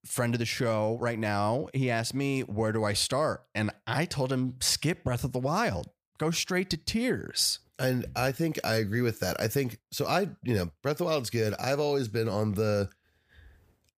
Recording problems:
none

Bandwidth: 15 kHz